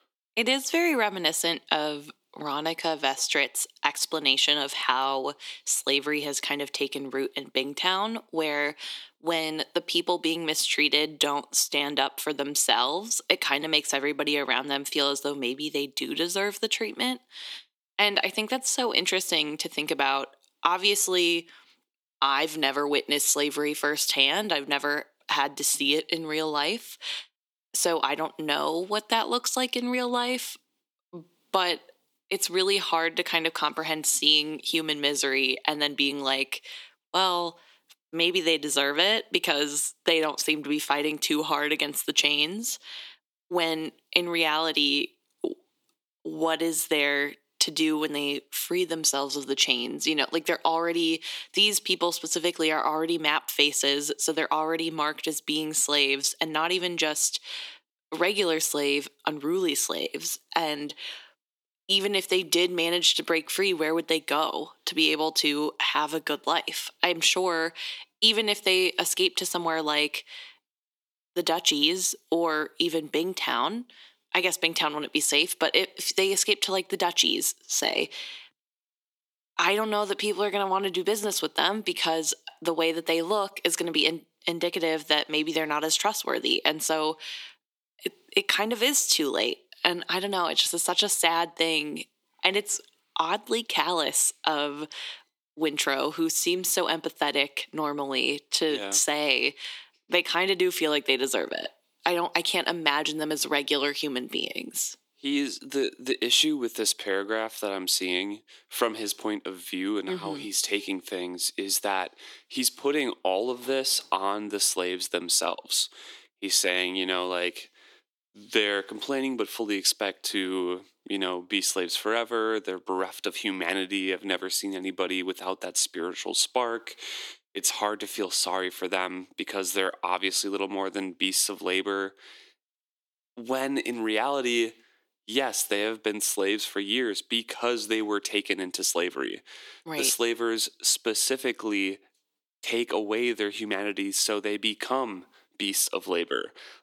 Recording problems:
thin; somewhat; fading below 300 Hz

